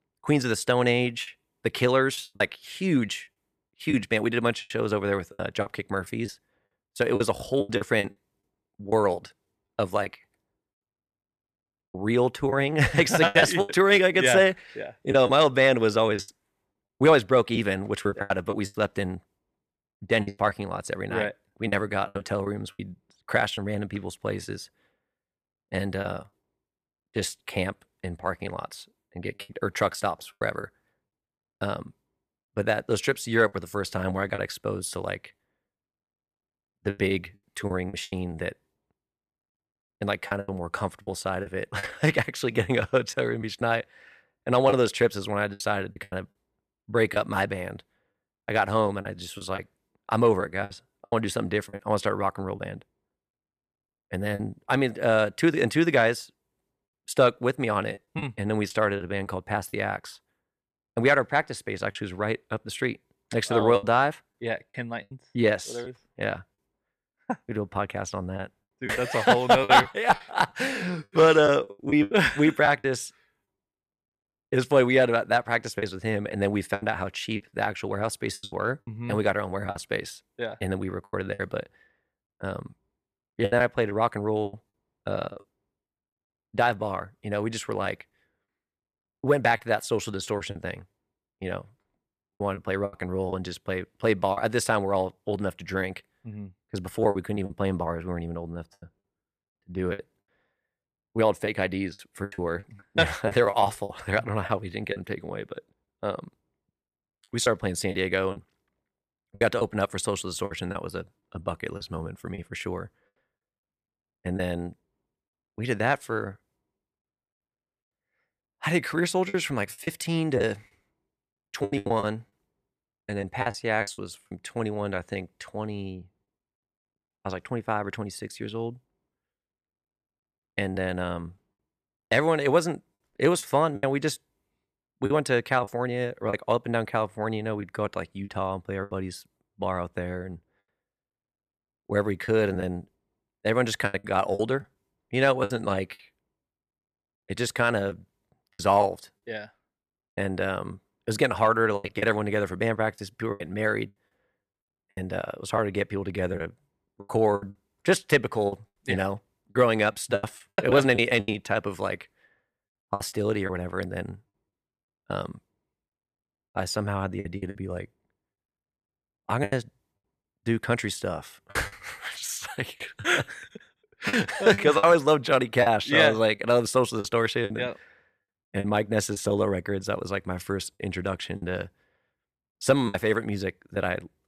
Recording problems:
choppy; very; 7% of the speech affected

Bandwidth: 14.5 kHz